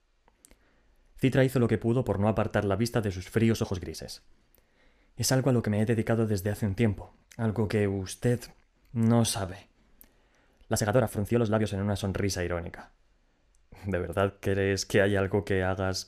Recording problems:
uneven, jittery; strongly; from 1 to 14 s

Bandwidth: 14.5 kHz